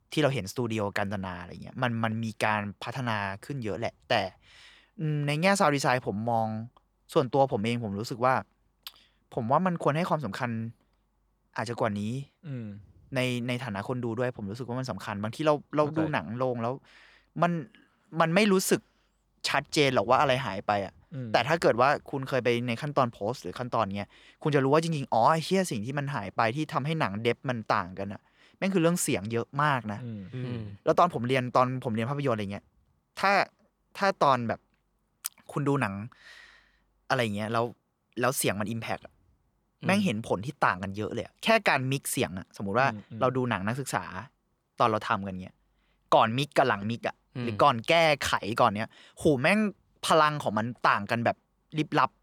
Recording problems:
none

